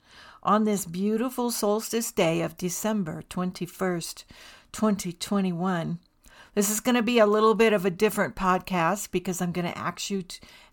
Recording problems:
none

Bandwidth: 17.5 kHz